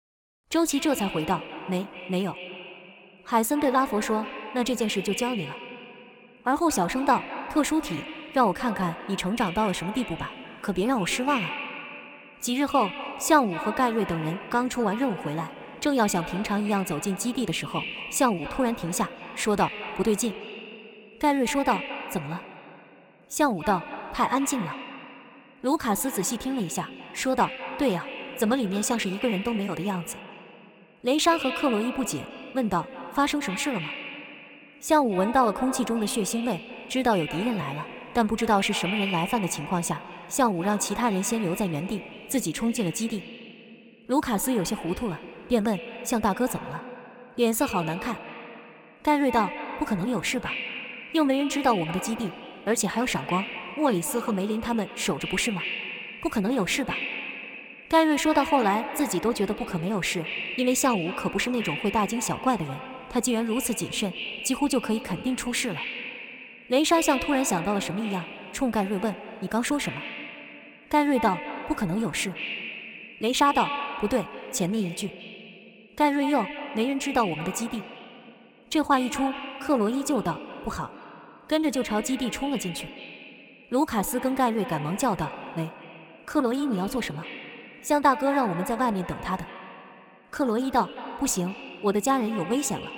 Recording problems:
echo of what is said; strong; throughout; 210 ms later, 10 dB below the speech

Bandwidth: 17 kHz